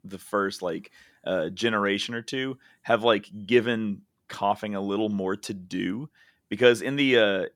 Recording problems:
none

